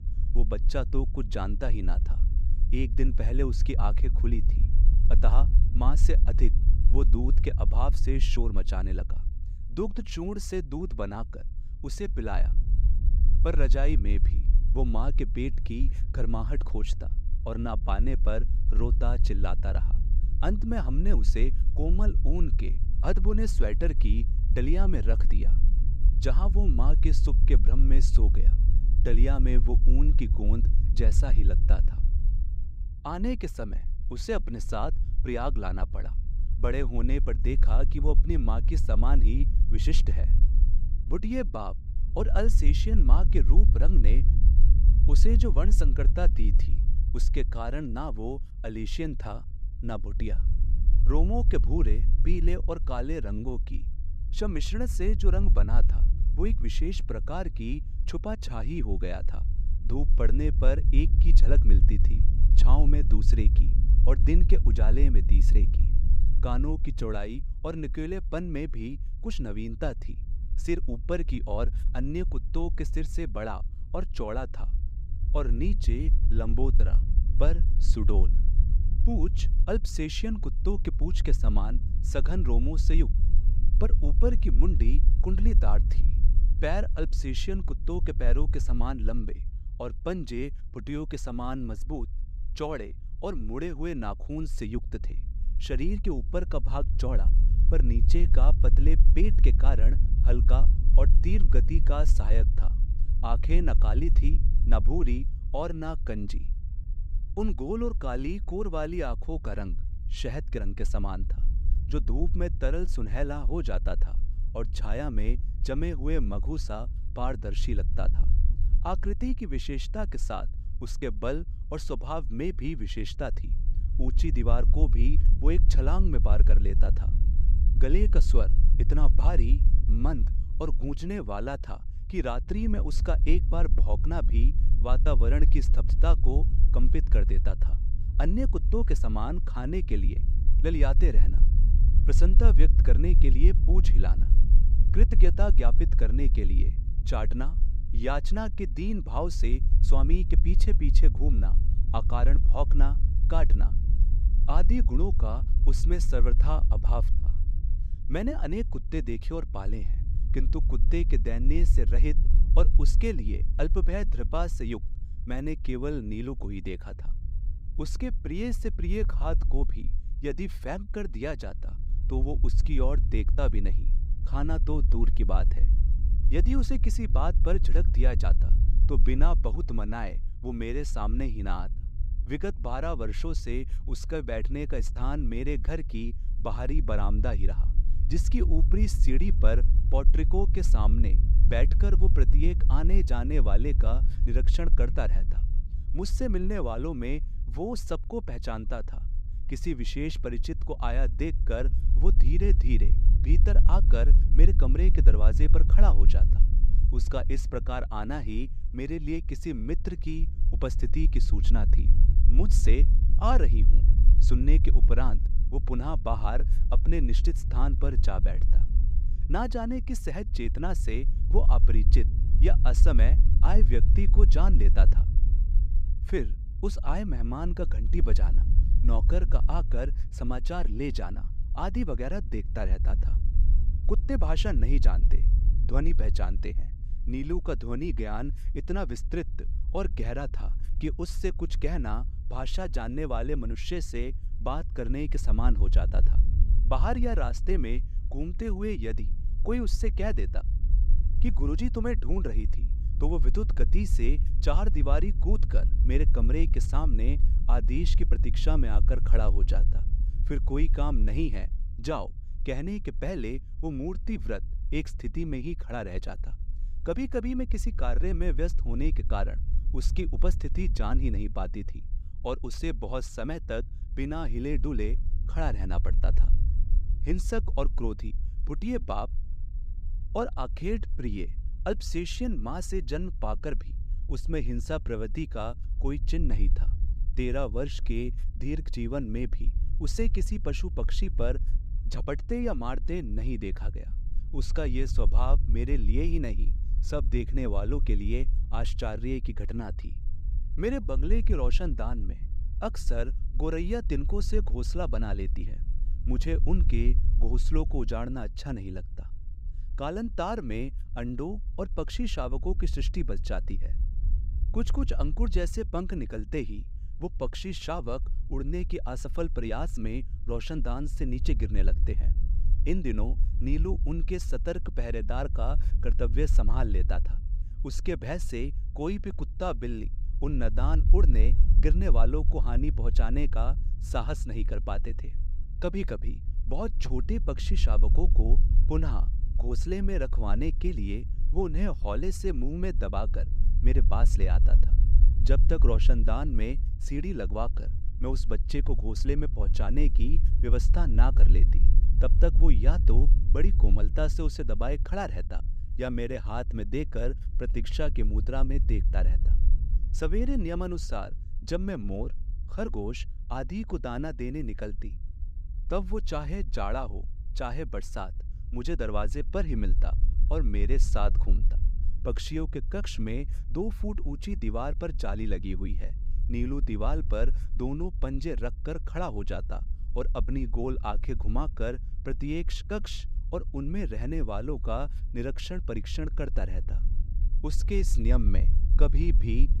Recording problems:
low rumble; noticeable; throughout; 15 dB below the speech

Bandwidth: 15.5 kHz